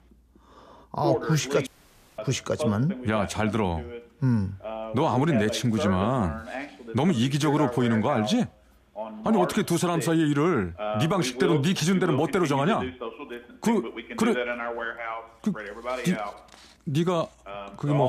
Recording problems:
voice in the background; loud; throughout; 8 dB below the speech
audio cutting out; at 1.5 s for 0.5 s
abrupt cut into speech; at the end

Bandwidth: 14.5 kHz